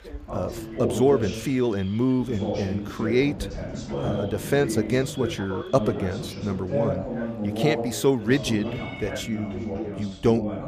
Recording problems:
background chatter; loud; throughout; 2 voices, 5 dB below the speech
animal sounds; faint; throughout; 20 dB below the speech

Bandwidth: 15 kHz